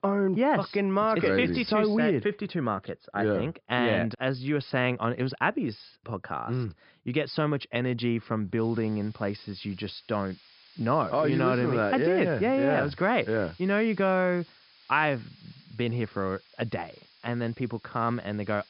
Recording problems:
high frequencies cut off; noticeable; nothing above 5.5 kHz
hiss; faint; from 8.5 s on; 25 dB below the speech

